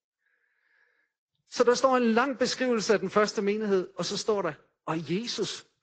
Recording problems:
high frequencies cut off; noticeable; nothing above 7.5 kHz
garbled, watery; slightly

